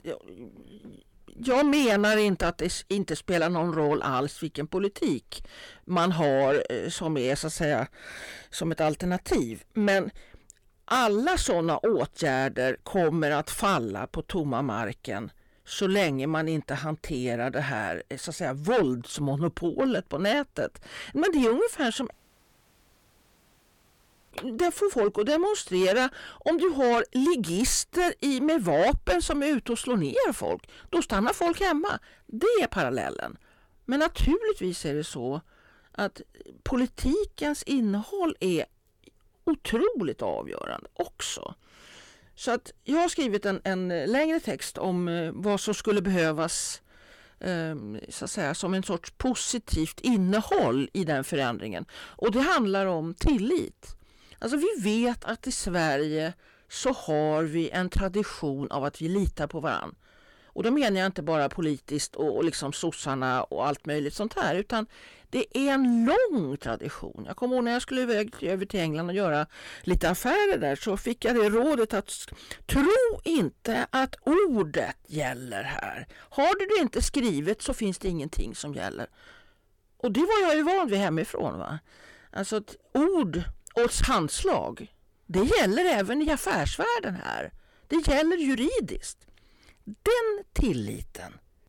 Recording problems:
distortion; heavy; 8 dB below the speech
audio cutting out; at 22 s for 2 s

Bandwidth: 18 kHz